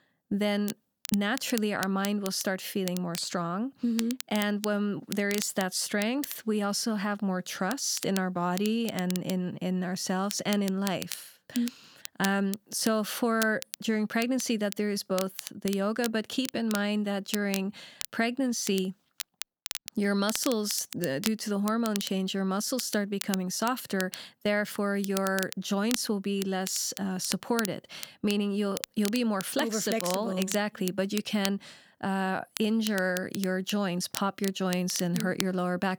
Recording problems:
crackle, like an old record; noticeable; 10 dB below the speech

